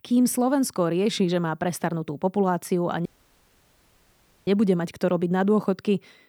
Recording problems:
audio cutting out; at 3 s for 1.5 s

